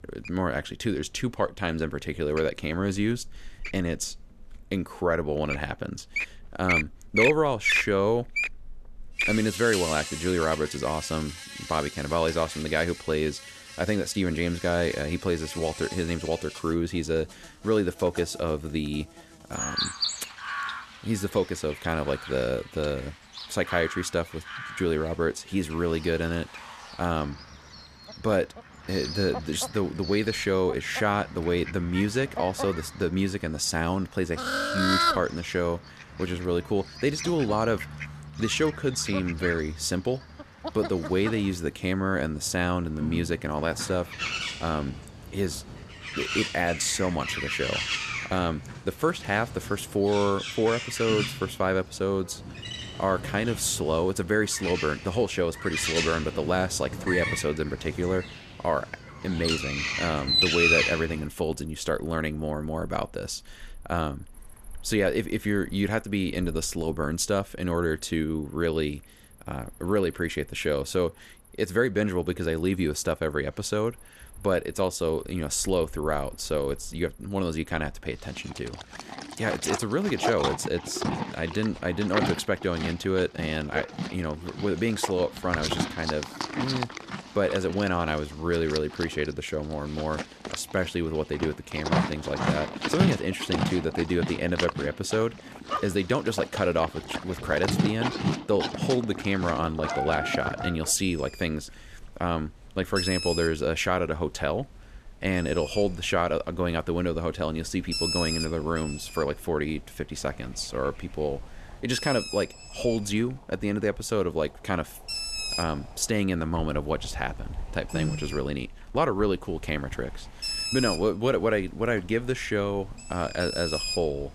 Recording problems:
animal sounds; loud; throughout; 4 dB below the speech

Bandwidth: 14 kHz